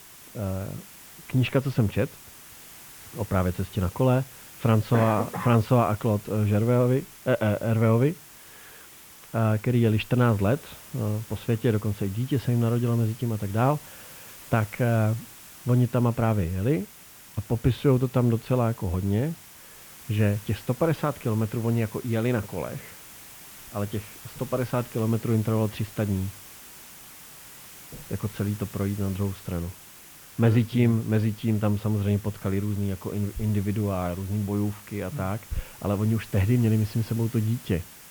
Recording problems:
muffled; very; fading above 2.5 kHz
hiss; noticeable; throughout; 20 dB below the speech

